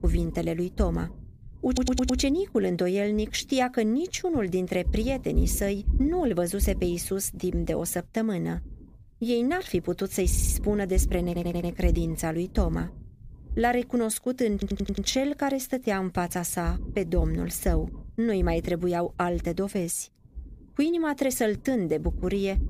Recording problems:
low rumble; faint; throughout; 20 dB below the speech
audio stuttering; 4 times, first at 1.5 s

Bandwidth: 15 kHz